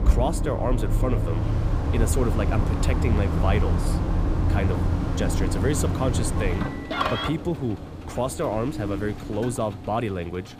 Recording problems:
traffic noise; very loud; throughout; 3 dB above the speech
wind noise on the microphone; occasional gusts; 15 dB below the speech

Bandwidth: 15 kHz